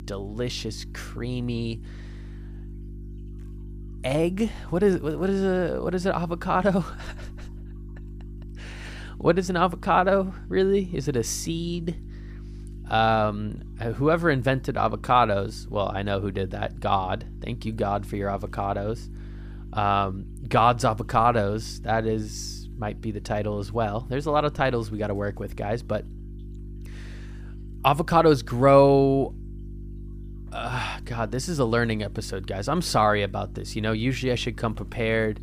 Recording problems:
electrical hum; faint; throughout; 50 Hz, 25 dB below the speech

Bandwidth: 15 kHz